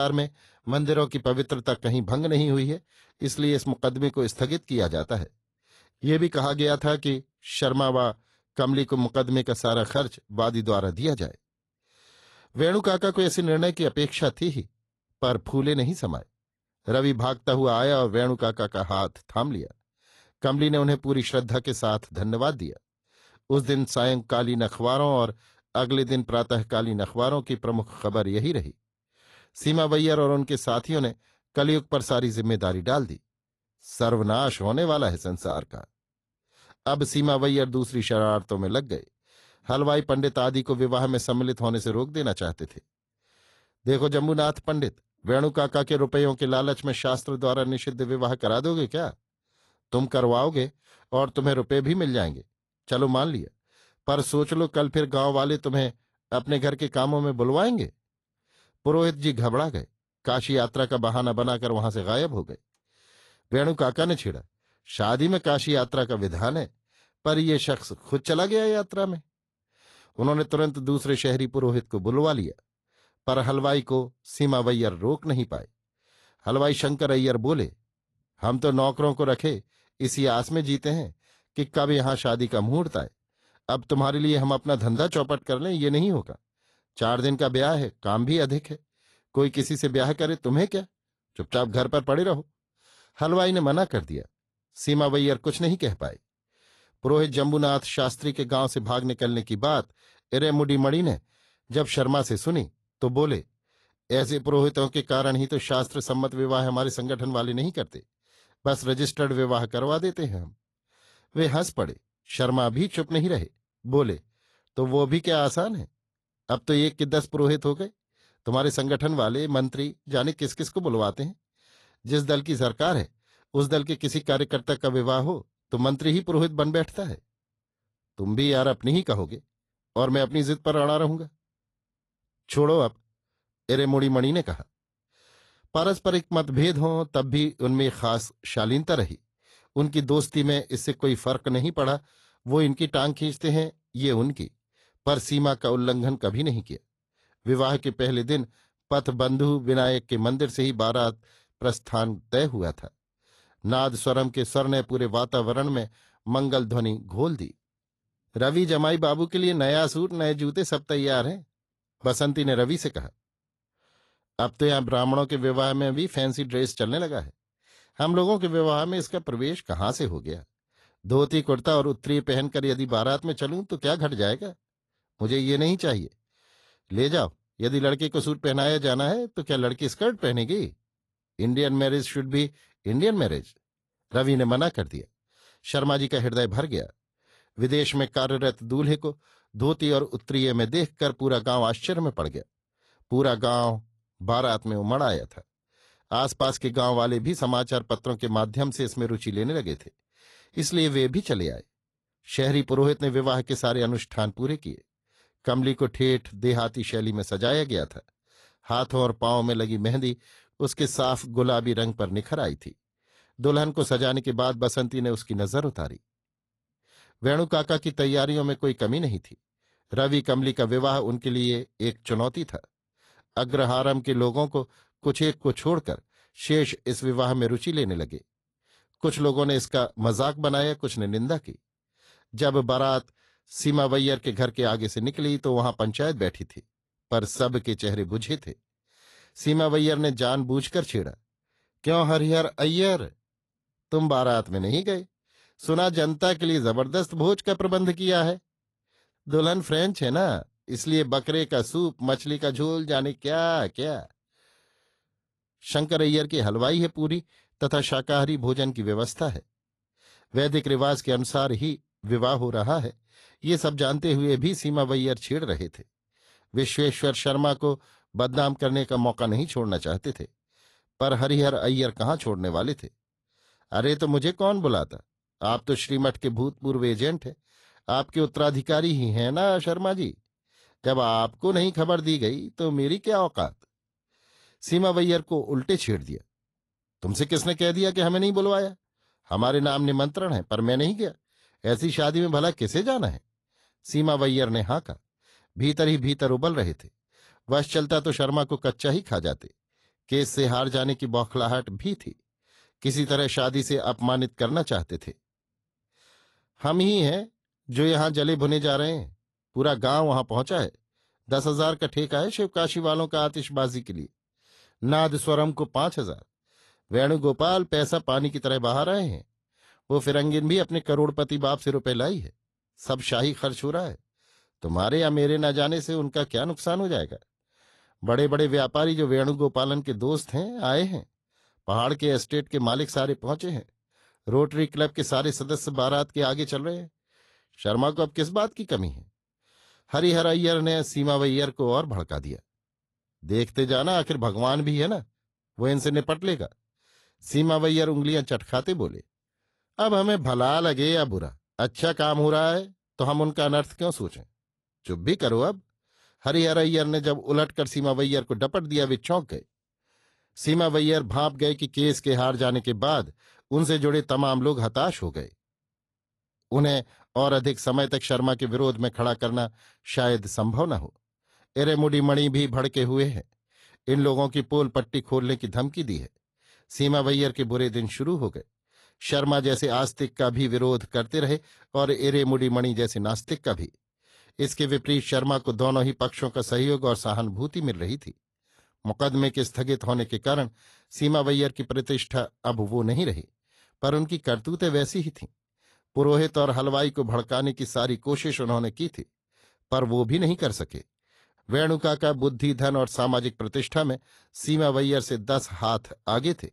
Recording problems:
garbled, watery; slightly; nothing above 11.5 kHz
abrupt cut into speech; at the start

